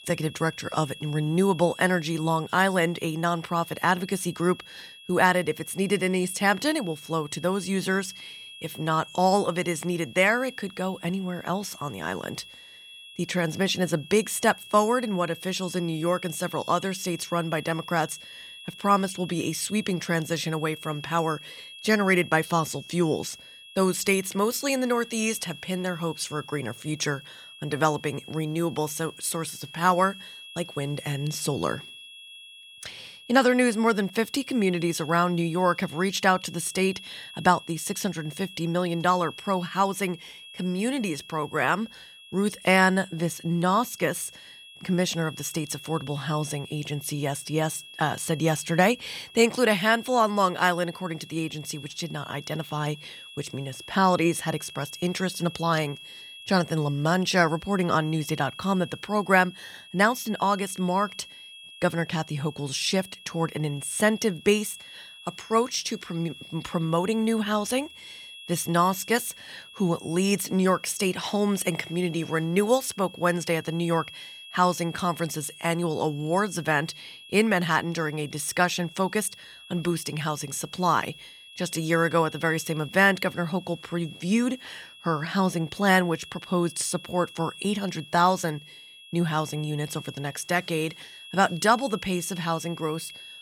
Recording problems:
high-pitched whine; noticeable; throughout; 3.5 kHz, 15 dB below the speech

